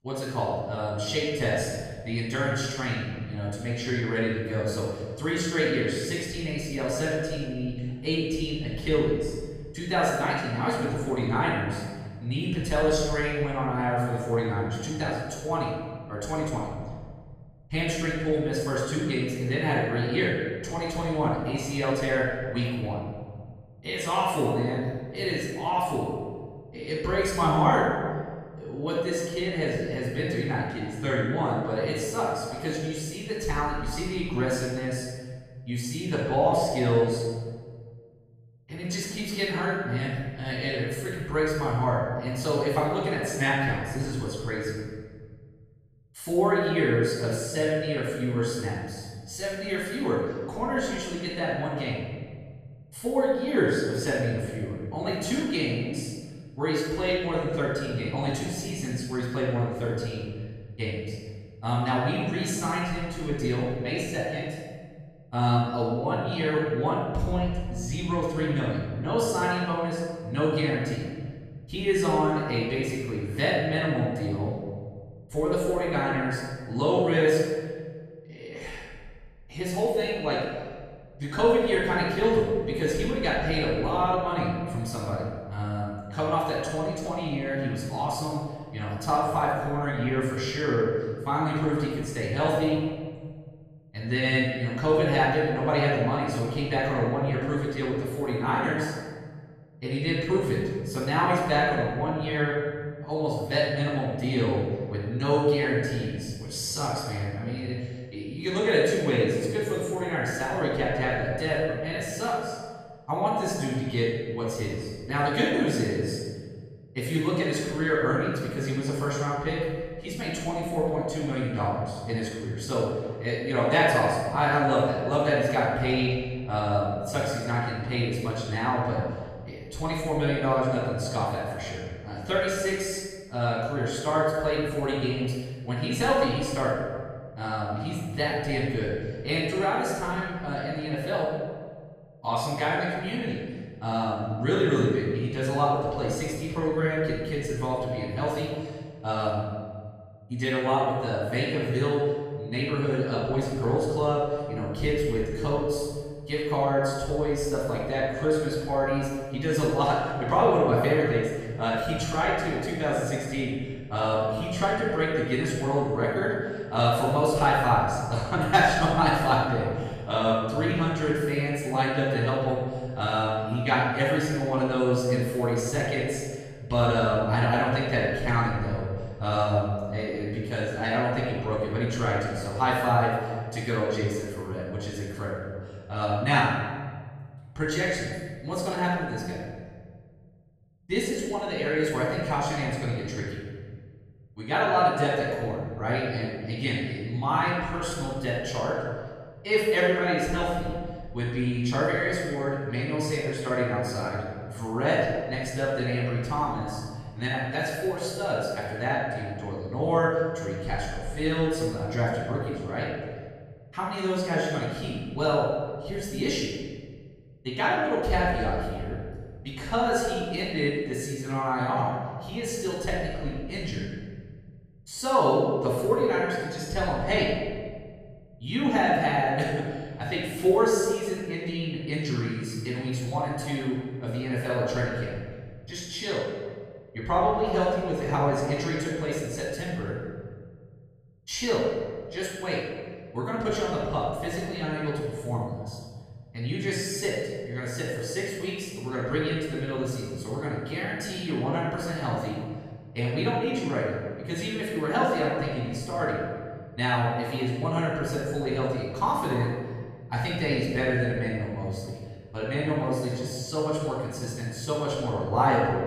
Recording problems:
room echo; strong; dies away in 1.7 s
off-mic speech; far

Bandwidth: 14 kHz